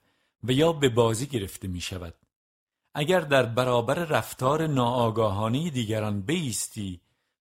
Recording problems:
none

